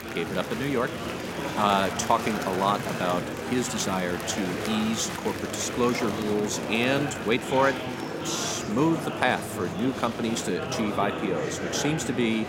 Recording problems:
murmuring crowd; loud; throughout; 4 dB below the speech

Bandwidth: 16 kHz